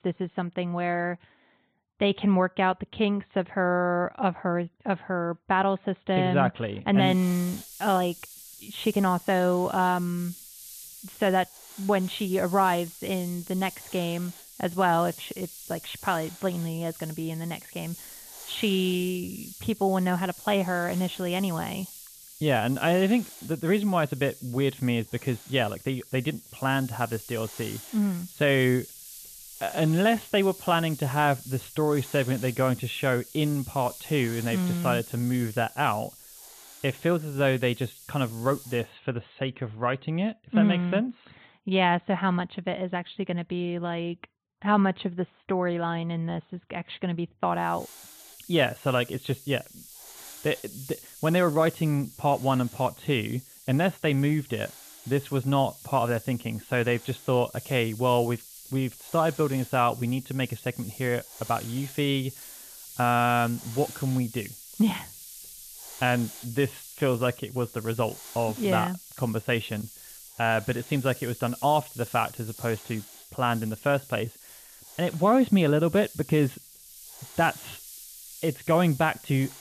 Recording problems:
high frequencies cut off; severe; nothing above 4 kHz
hiss; noticeable; from 7 to 39 s and from 48 s on; 15 dB below the speech

